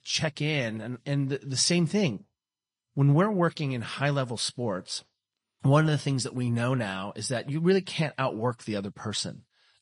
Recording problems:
garbled, watery; slightly; nothing above 10 kHz

